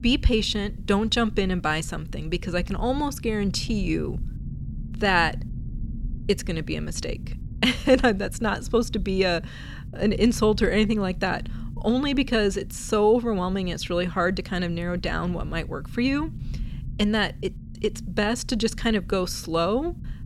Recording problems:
low rumble; faint; throughout; 25 dB below the speech

